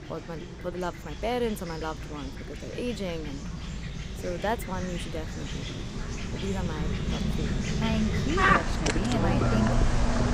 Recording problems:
animal sounds; very loud; throughout; 4 dB above the speech

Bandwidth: 15.5 kHz